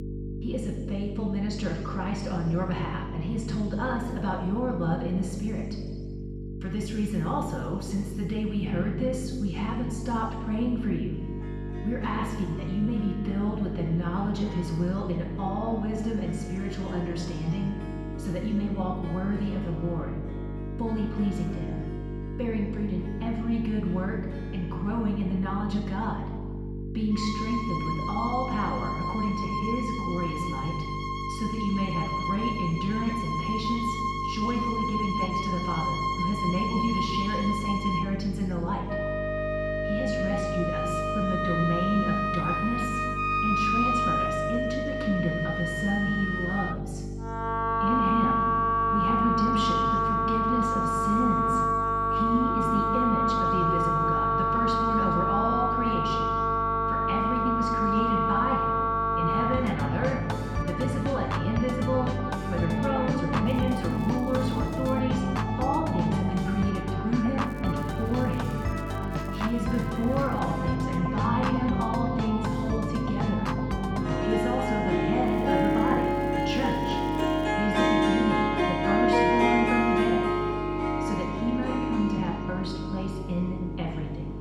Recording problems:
off-mic speech; far
room echo; noticeable; dies away in 1.2 s
muffled; slightly; fading above 2.5 kHz
background music; very loud; throughout; 2 dB above the speech
electrical hum; loud; throughout; 50 Hz, 10 dB below the speech
crackling; faint; from 1:03 to 1:05, from 1:07 to 1:10 and from 1:15 to 1:17; 25 dB below the speech

